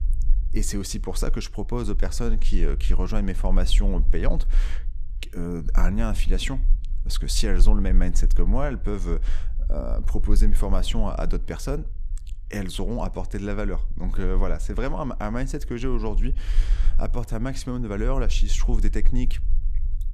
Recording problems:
low rumble; faint; throughout; 20 dB below the speech

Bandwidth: 14.5 kHz